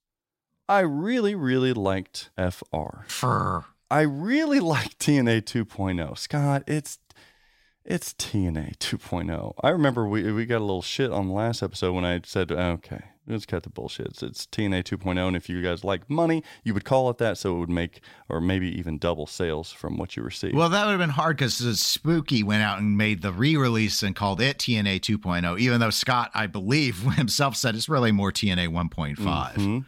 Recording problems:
none

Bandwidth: 16 kHz